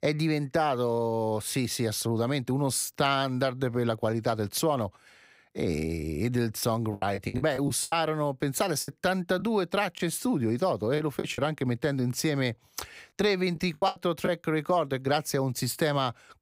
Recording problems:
choppy; very; from 7 to 10 s, at 11 s and at 14 s; 14% of the speech affected

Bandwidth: 15.5 kHz